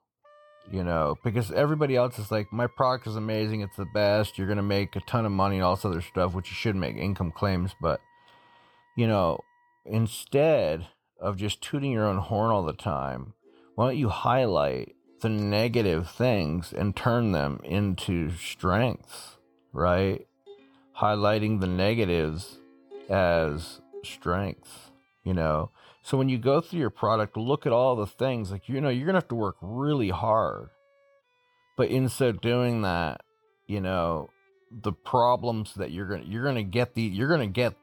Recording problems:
background music; faint; throughout; 30 dB below the speech

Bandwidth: 18.5 kHz